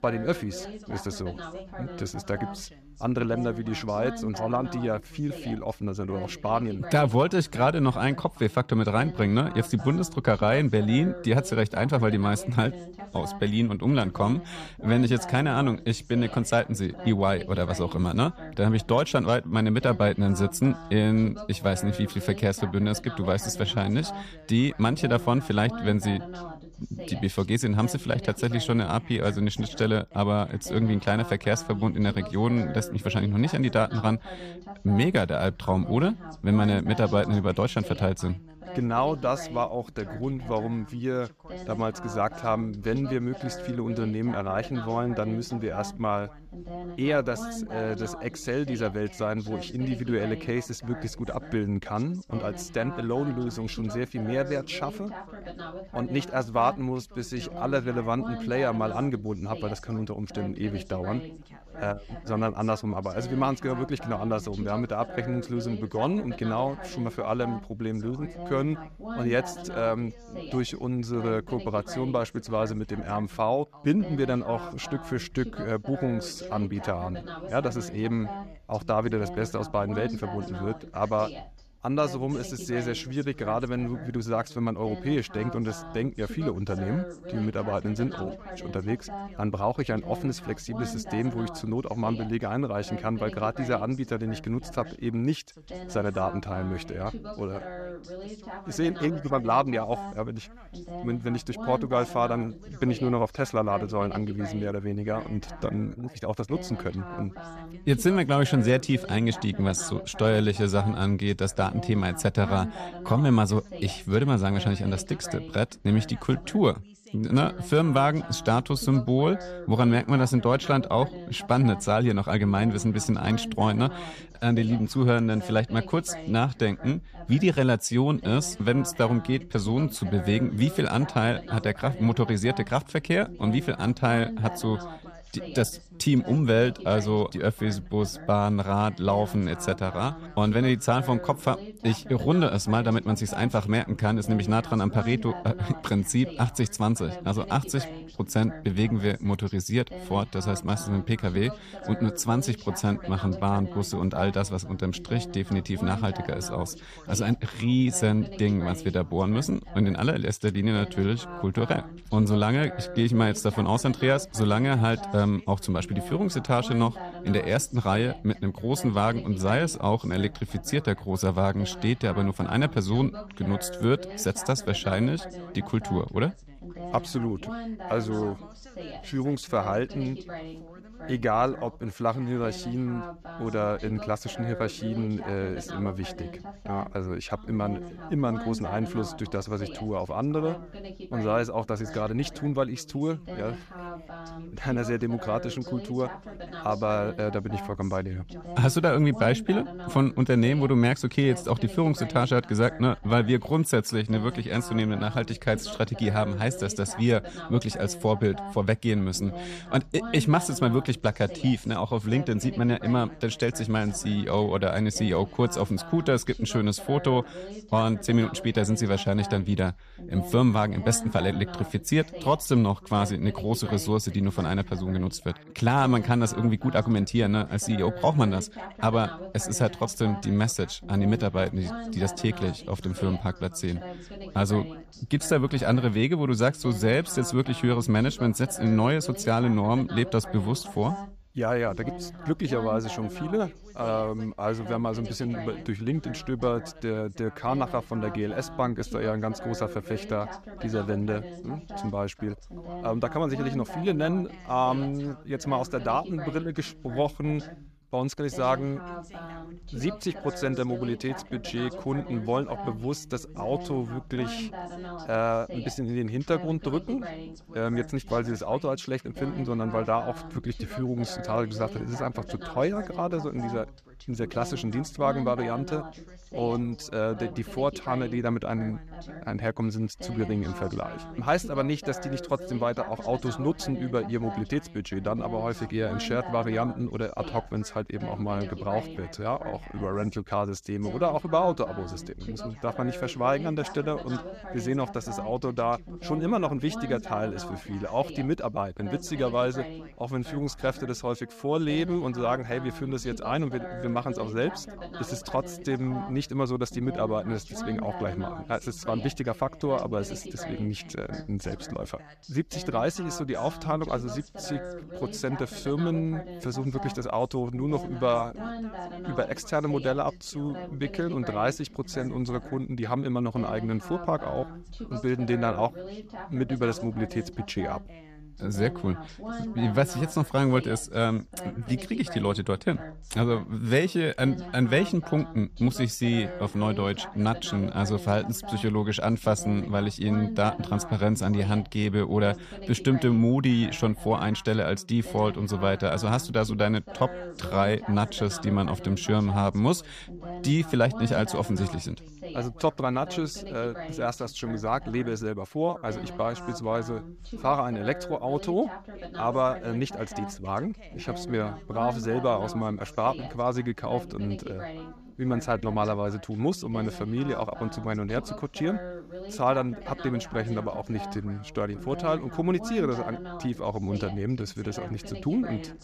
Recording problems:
background chatter; noticeable; throughout; 2 voices, 15 dB below the speech

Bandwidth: 14.5 kHz